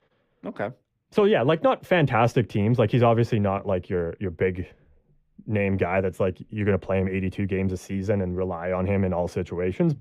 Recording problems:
muffled; slightly; fading above 3 kHz

